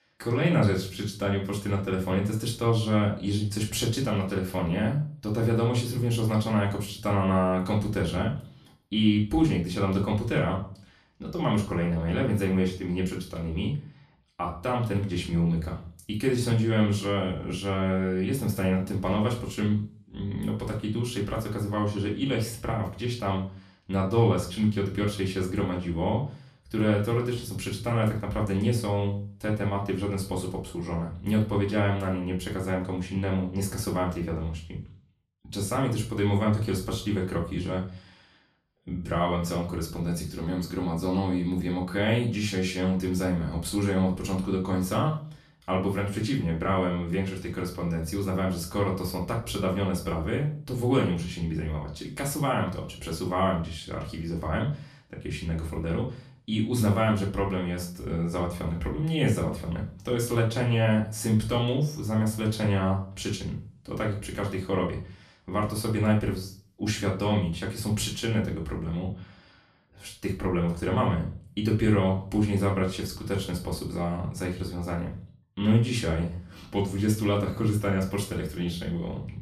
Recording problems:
off-mic speech; far
room echo; slight; dies away in 0.3 s

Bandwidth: 14.5 kHz